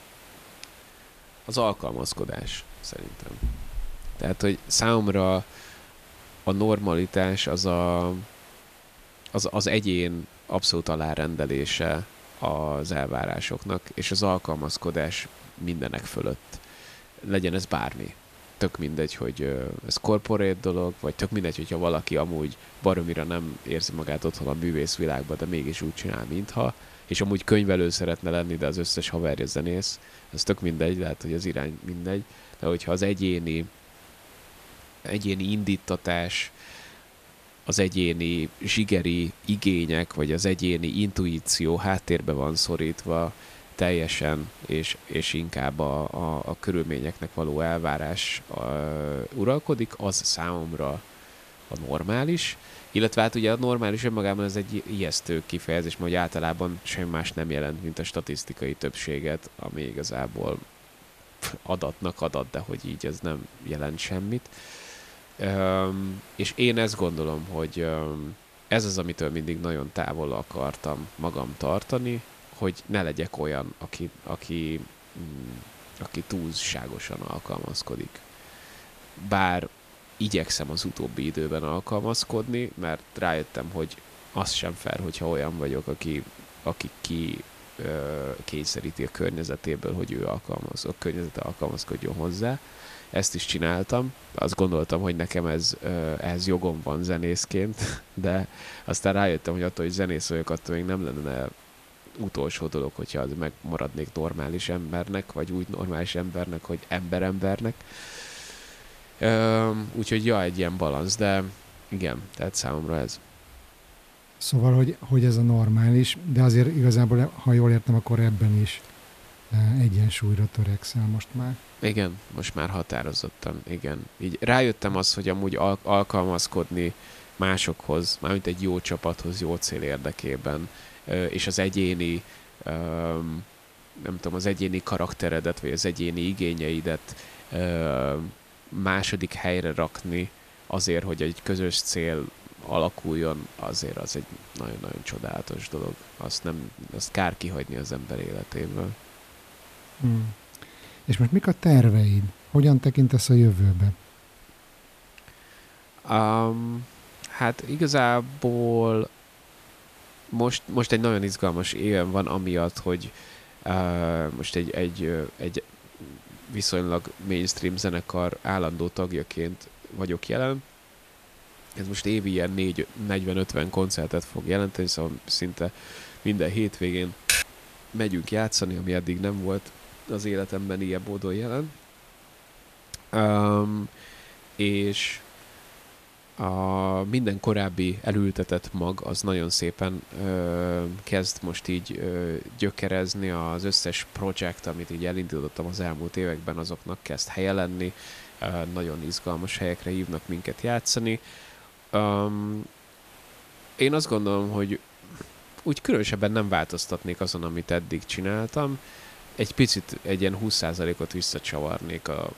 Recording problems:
hiss; faint; throughout; 20 dB below the speech
keyboard typing; loud; at 2:57; peak 4 dB above the speech

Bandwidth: 14.5 kHz